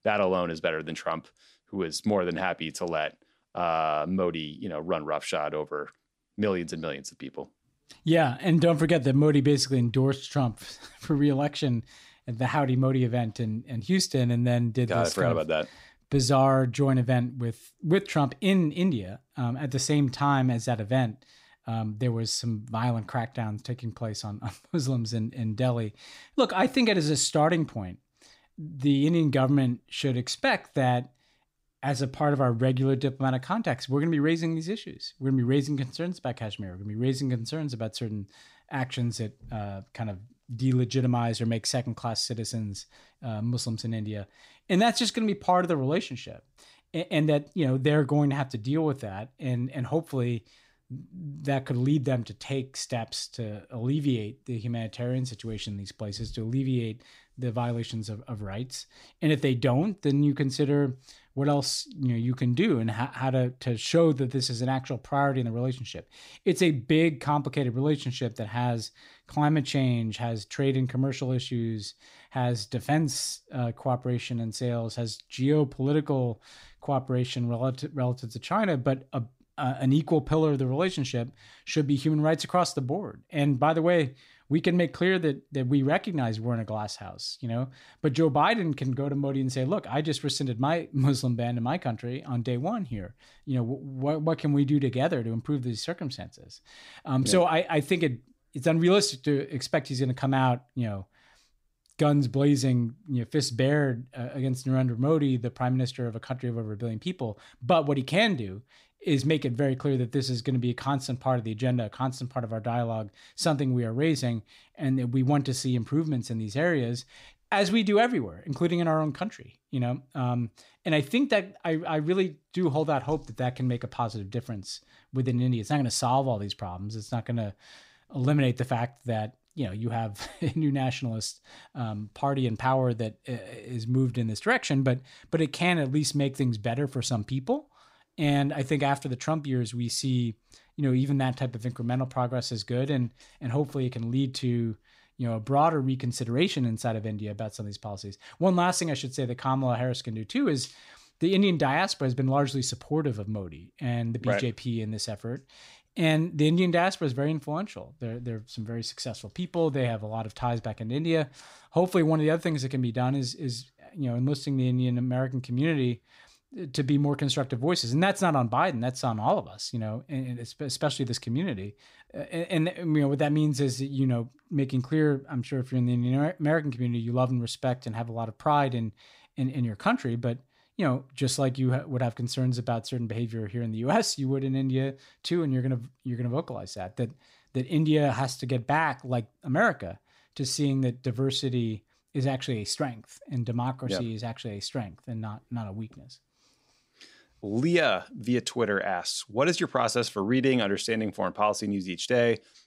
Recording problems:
none

